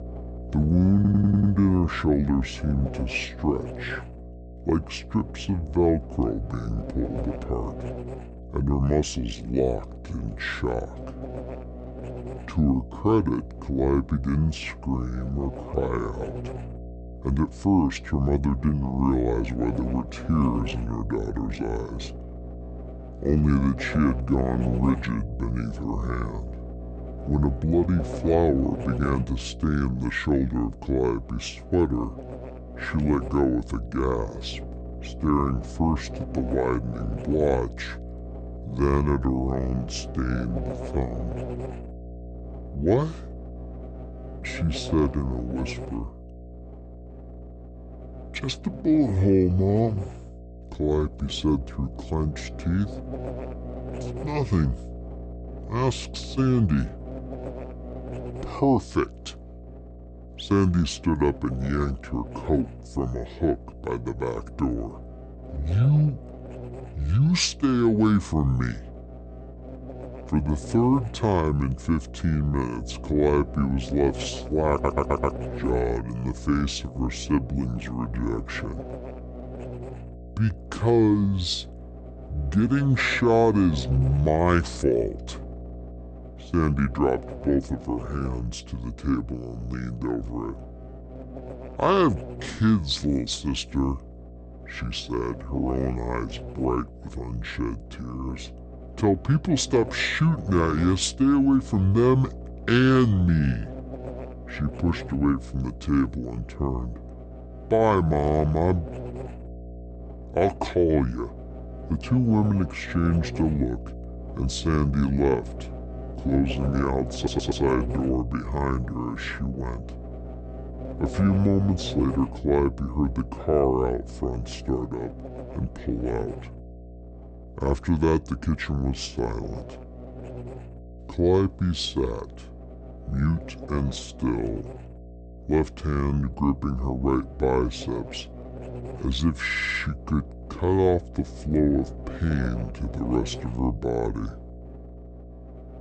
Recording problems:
wrong speed and pitch; too slow and too low; 0.6 times normal speed
electrical hum; noticeable; throughout; 60 Hz, 15 dB below the speech
audio stuttering; 4 times, first at 1 s

